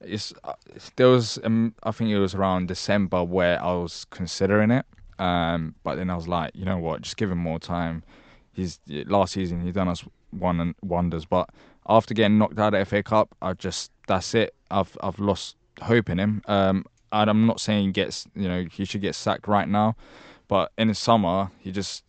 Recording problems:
high frequencies cut off; noticeable; nothing above 8 kHz

